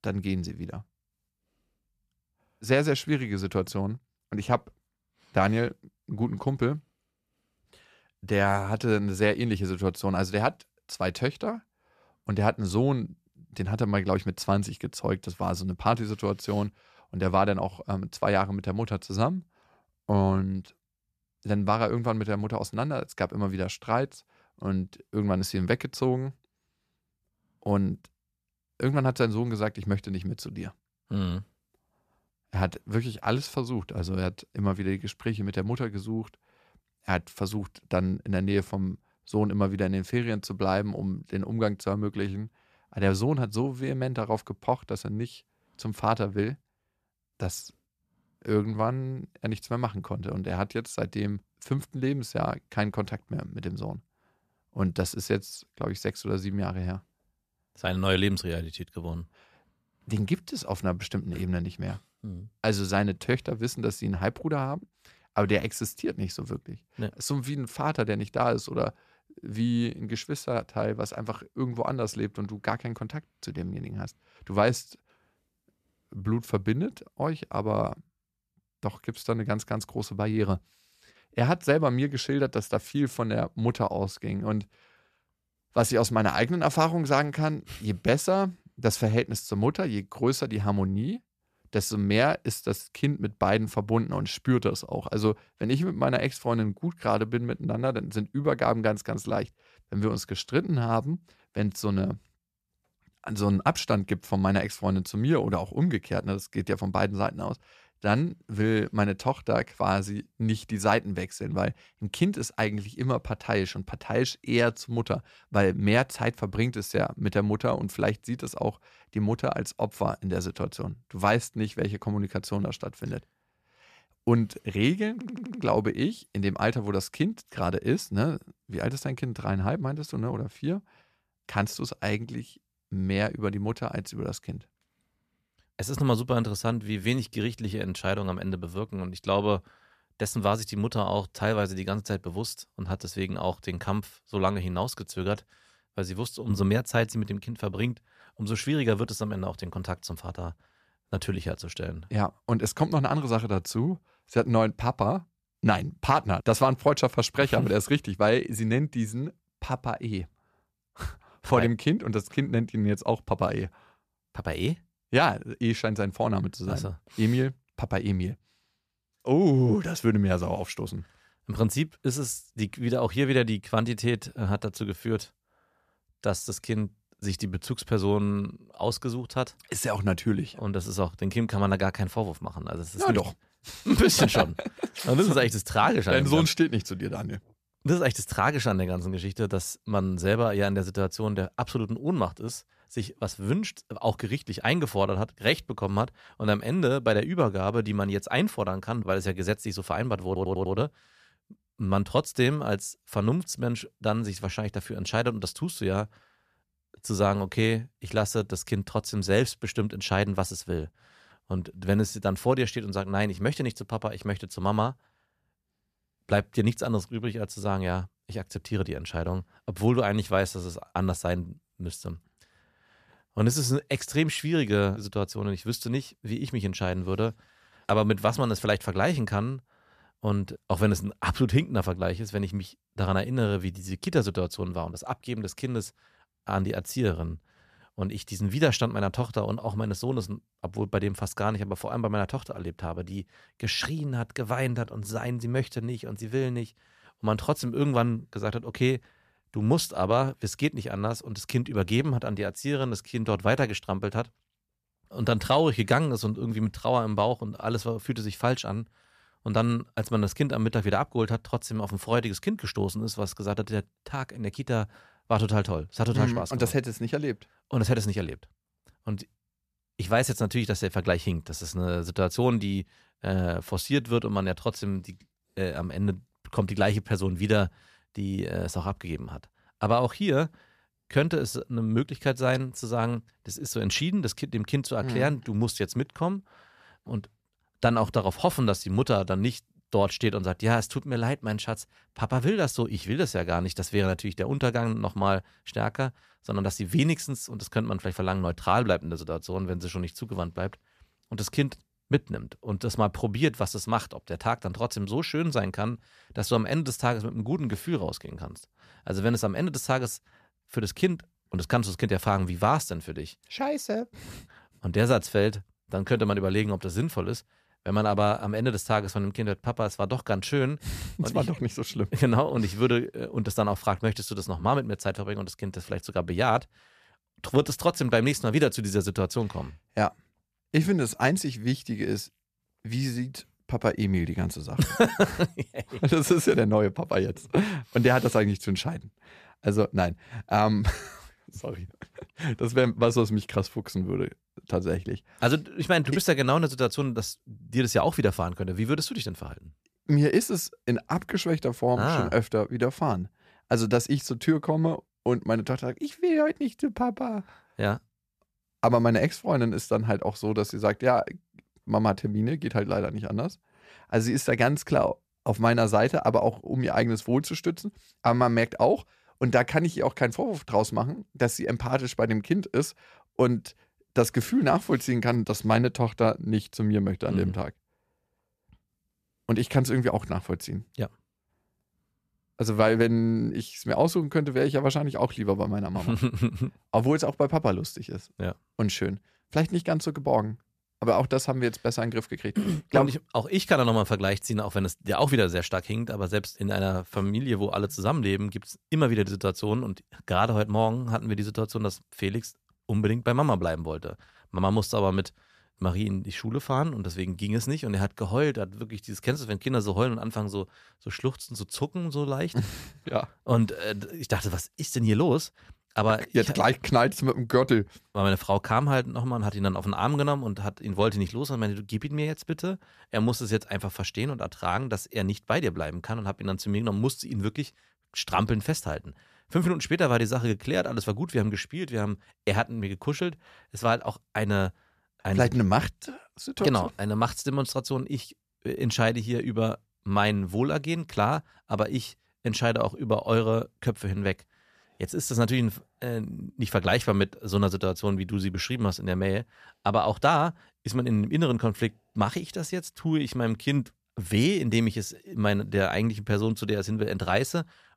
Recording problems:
audio stuttering; at 2:05 and at 3:20

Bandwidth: 14.5 kHz